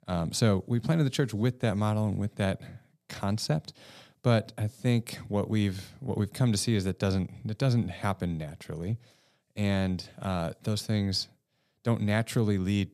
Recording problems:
none

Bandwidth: 14.5 kHz